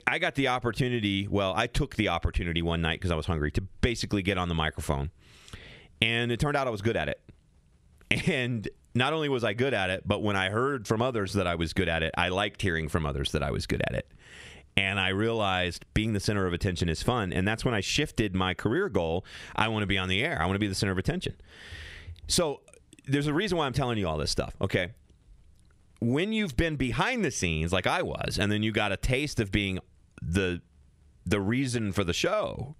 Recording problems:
squashed, flat; heavily

